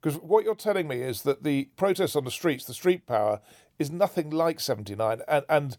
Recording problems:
none

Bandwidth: 18 kHz